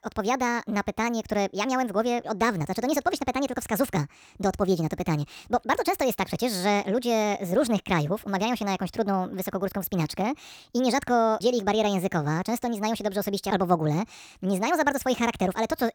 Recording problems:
wrong speed and pitch; too fast and too high; 1.5 times normal speed

